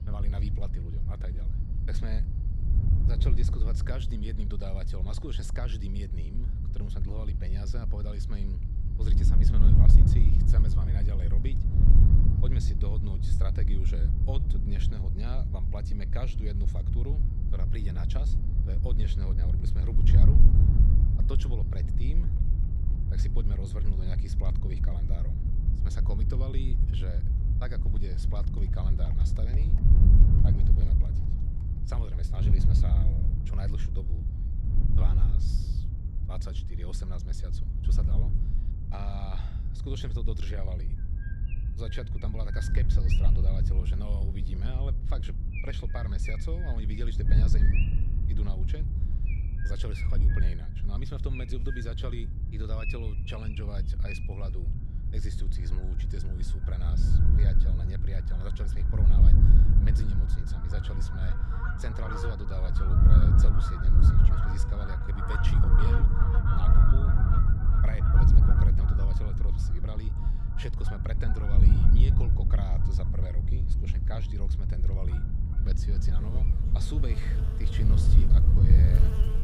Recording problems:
wind noise on the microphone; heavy; 1 dB above the speech
animal sounds; loud; throughout; 3 dB below the speech

